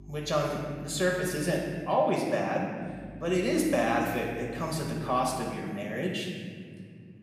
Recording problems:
room echo; noticeable; dies away in 2.1 s
off-mic speech; somewhat distant
electrical hum; faint; until 2 s and from 3 to 5.5 s; 50 Hz, 30 dB below the speech

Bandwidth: 15 kHz